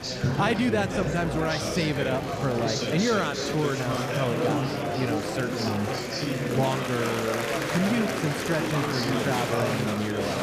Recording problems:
murmuring crowd; very loud; throughout; as loud as the speech

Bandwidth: 14.5 kHz